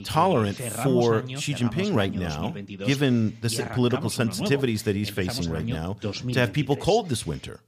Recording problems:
voice in the background; loud; throughout; 9 dB below the speech

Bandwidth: 15 kHz